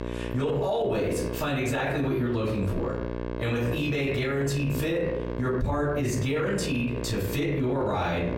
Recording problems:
off-mic speech; far
squashed, flat; heavily
room echo; slight; dies away in 0.5 s
electrical hum; noticeable; throughout; 60 Hz, 10 dB below the speech

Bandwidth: 16 kHz